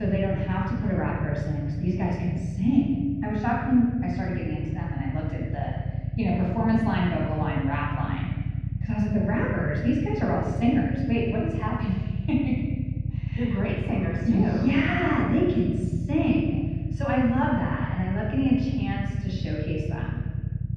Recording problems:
off-mic speech; far
muffled; very; fading above 2.5 kHz
room echo; noticeable; dies away in 1.5 s
low rumble; noticeable; throughout; 15 dB below the speech
abrupt cut into speech; at the start

